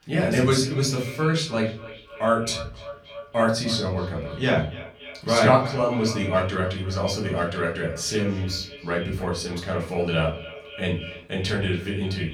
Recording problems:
off-mic speech; far
echo of what is said; noticeable; throughout; 280 ms later, 15 dB below the speech
room echo; slight; dies away in 0.4 s

